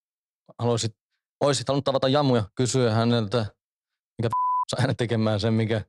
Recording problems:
uneven, jittery; strongly; from 1.5 to 5 s

